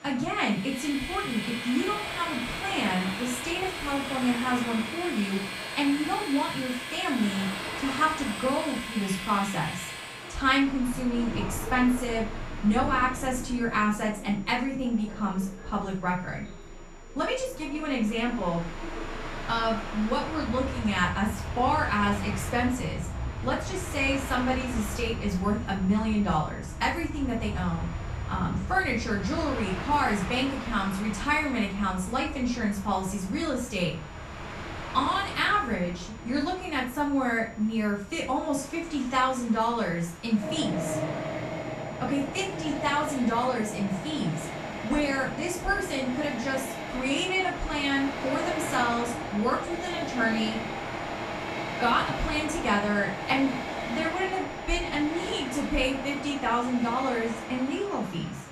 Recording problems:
off-mic speech; far
room echo; slight; dies away in 0.3 s
train or aircraft noise; loud; throughout; 7 dB below the speech
high-pitched whine; faint; throughout; 7 kHz, 30 dB below the speech
voice in the background; faint; throughout; 25 dB below the speech

